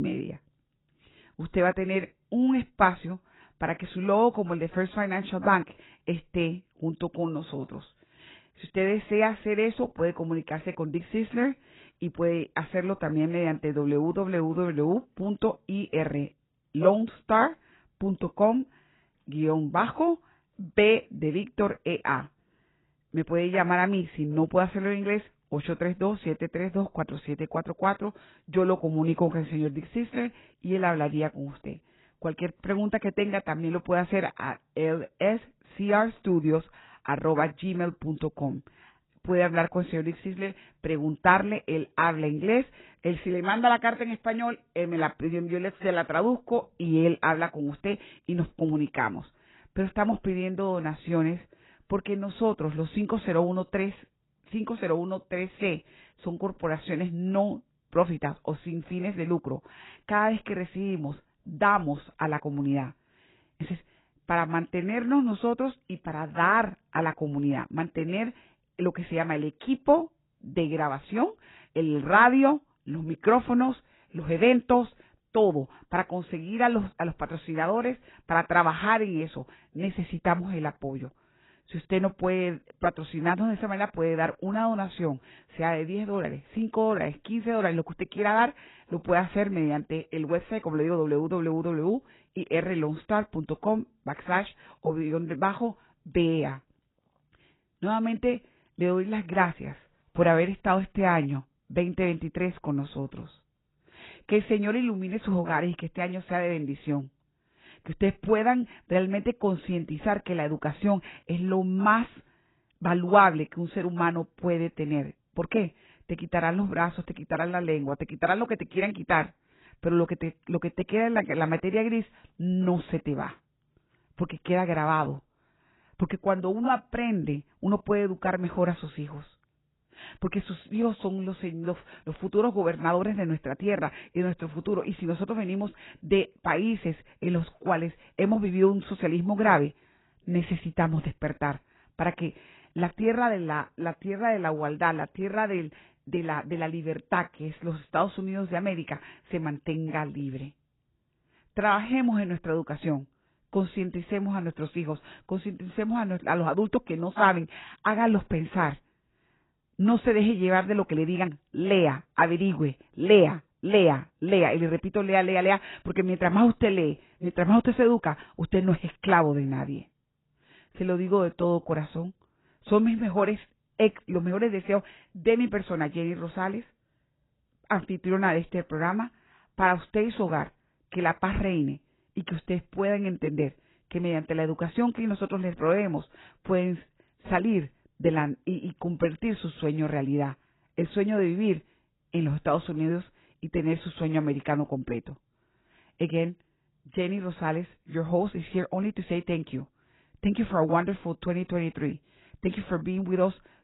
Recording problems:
garbled, watery; badly; nothing above 4 kHz
abrupt cut into speech; at the start

